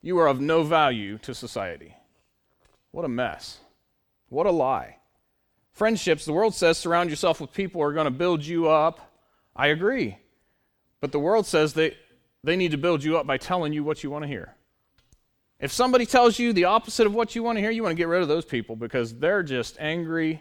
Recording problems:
none

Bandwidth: 18.5 kHz